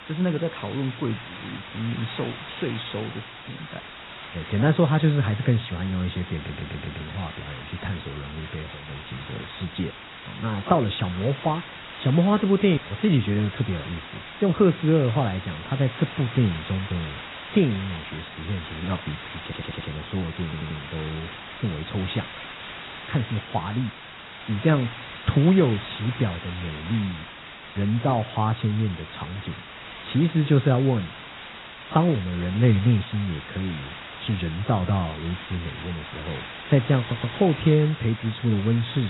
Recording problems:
garbled, watery; badly; nothing above 4 kHz
hiss; noticeable; throughout; 15 dB below the speech
audio stuttering; 4 times, first at 6.5 s
abrupt cut into speech; at the end

